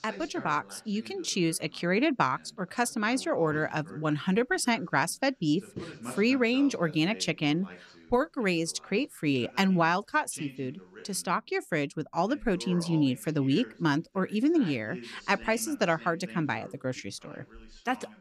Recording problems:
voice in the background; noticeable; throughout; 20 dB below the speech

